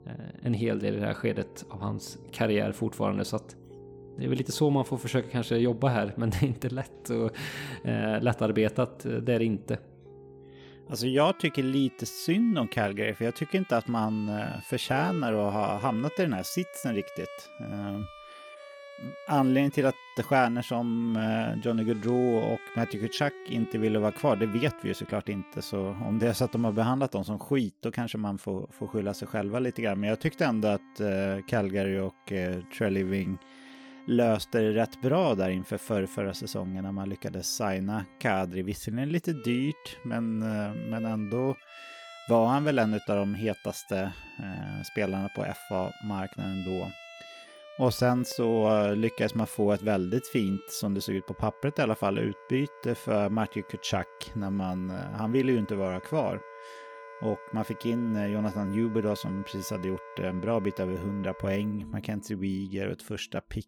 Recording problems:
background music; noticeable; throughout; 20 dB below the speech

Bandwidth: 18 kHz